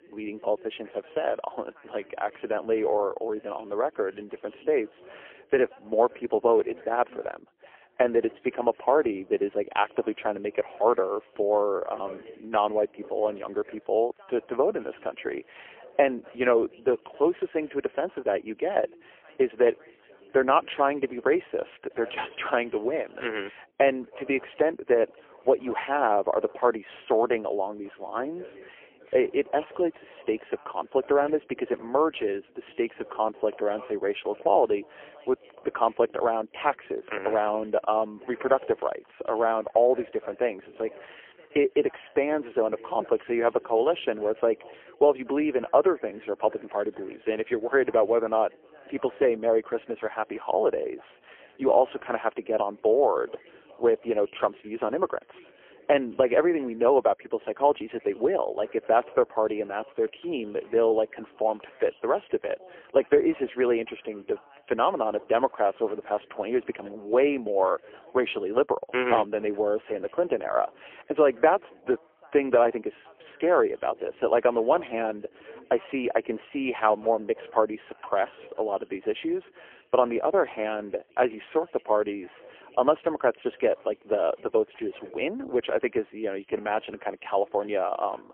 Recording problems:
phone-call audio; poor line; nothing above 3 kHz
background chatter; faint; throughout; 3 voices, 25 dB below the speech

